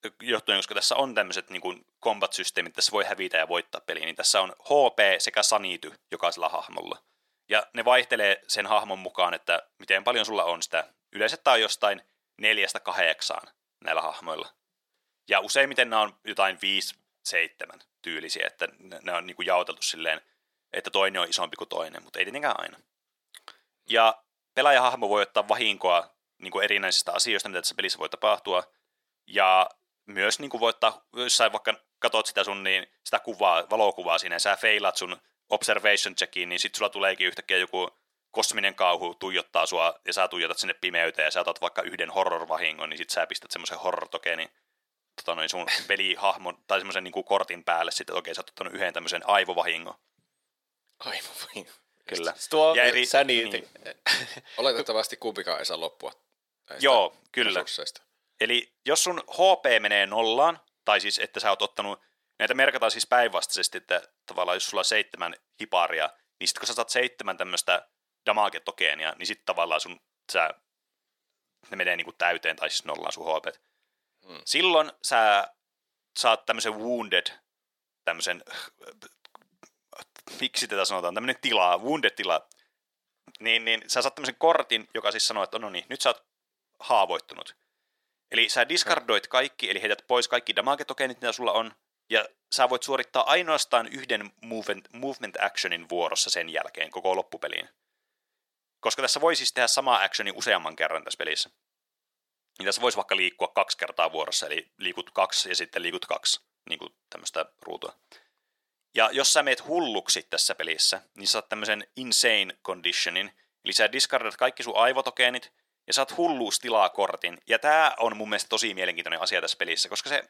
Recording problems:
thin; very; fading below 350 Hz

